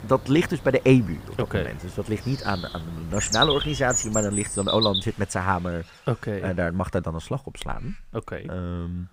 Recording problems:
animal sounds; loud; throughout; 1 dB below the speech

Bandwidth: 15.5 kHz